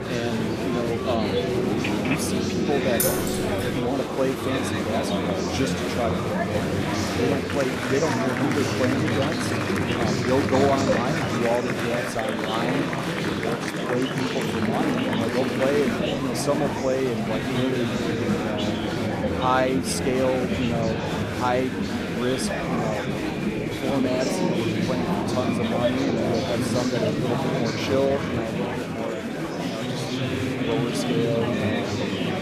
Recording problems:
murmuring crowd; very loud; throughout; 2 dB above the speech
phone ringing; noticeable; at 1.5 s; peak 2 dB below the speech
jangling keys; loud; at 3 s; peak 3 dB above the speech
dog barking; faint; at 23 s; peak 15 dB below the speech

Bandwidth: 14.5 kHz